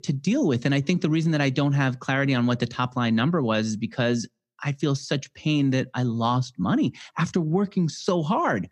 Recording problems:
none

